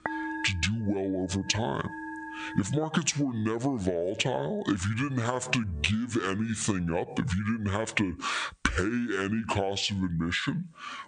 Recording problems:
squashed, flat; heavily, background pumping
wrong speed and pitch; too slow and too low; 0.6 times normal speed
background music; noticeable; until 8 s; 10 dB below the speech

